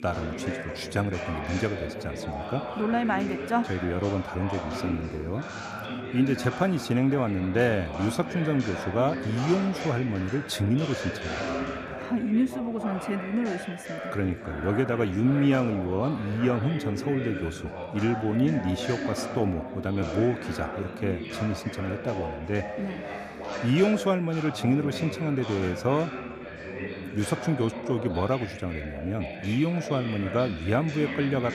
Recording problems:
background chatter; loud; throughout; 3 voices, 7 dB below the speech

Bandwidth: 14.5 kHz